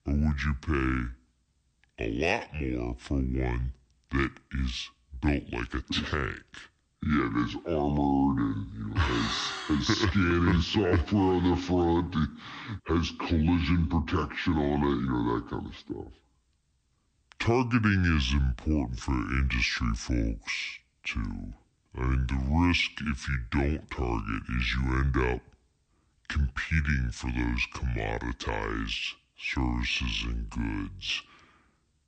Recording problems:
wrong speed and pitch; too slow and too low; 0.6 times normal speed

